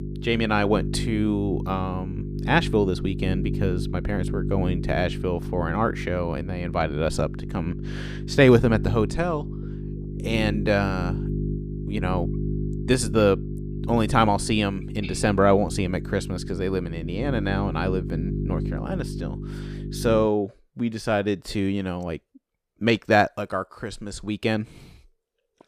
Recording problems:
electrical hum; noticeable; until 20 s; 50 Hz, 15 dB below the speech

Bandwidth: 14.5 kHz